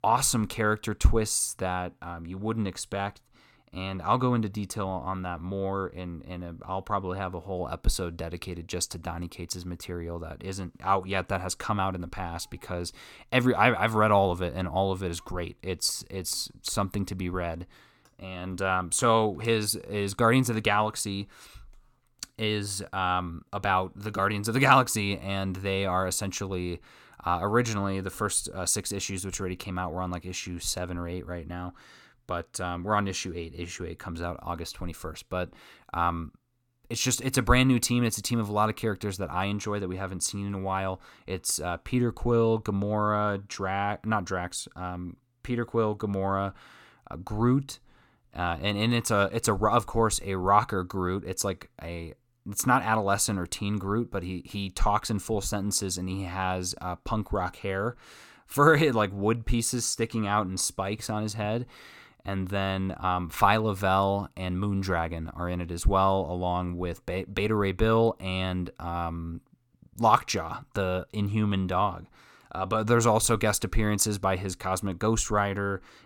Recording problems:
none

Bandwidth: 17.5 kHz